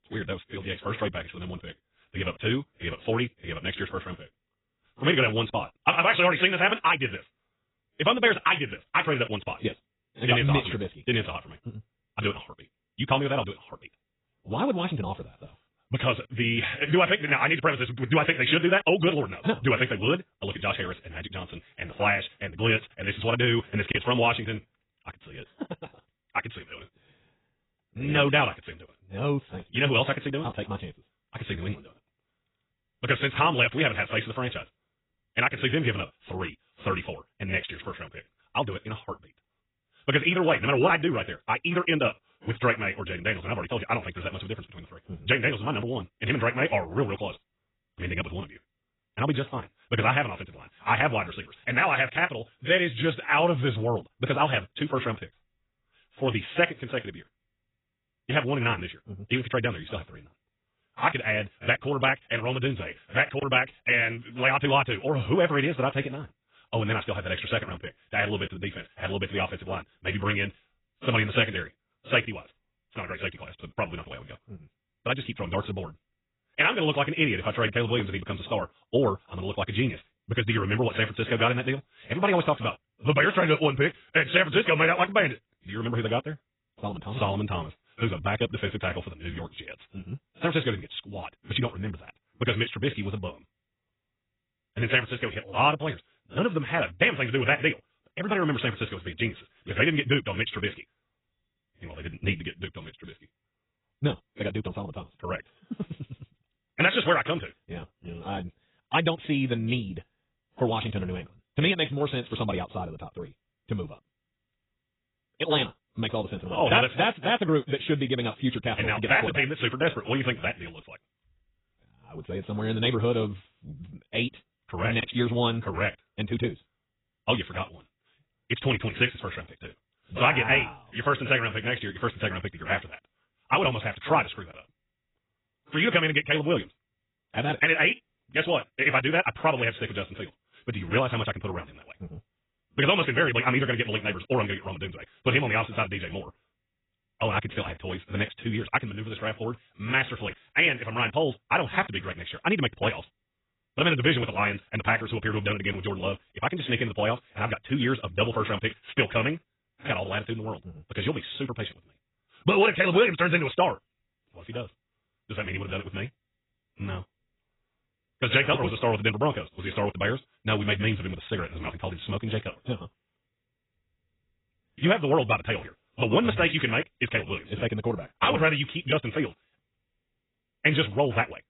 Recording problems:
garbled, watery; badly; nothing above 3.5 kHz
wrong speed, natural pitch; too fast; 1.7 times normal speed

